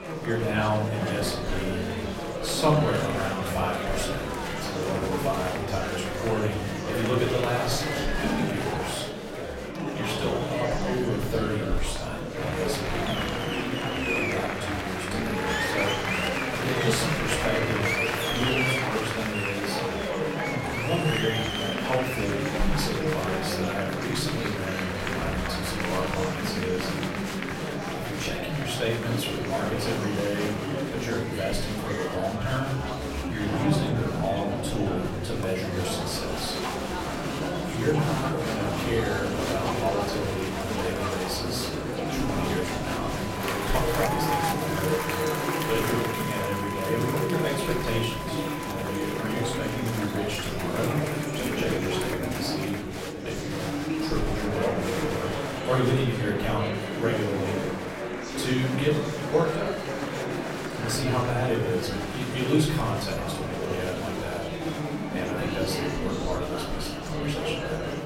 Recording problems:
off-mic speech; far
room echo; noticeable; dies away in 0.6 s
murmuring crowd; very loud; throughout; as loud as the speech
background music; noticeable; throughout; 15 dB below the speech

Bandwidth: 16 kHz